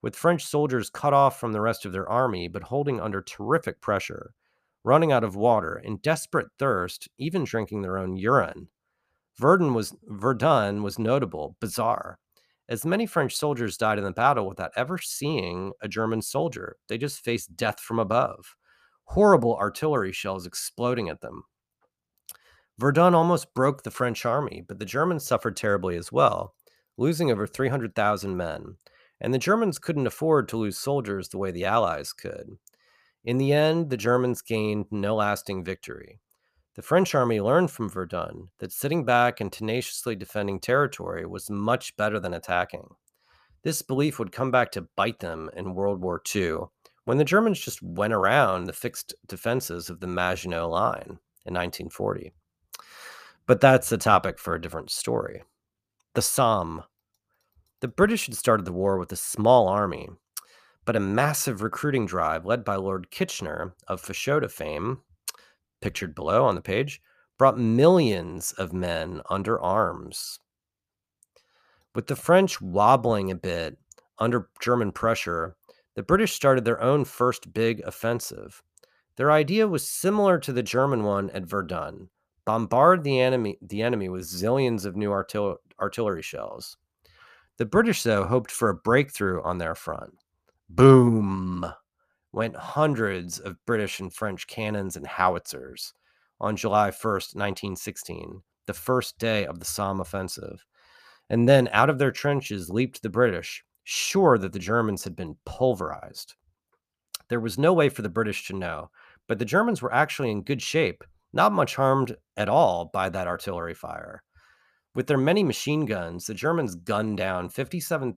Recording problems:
none

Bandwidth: 14.5 kHz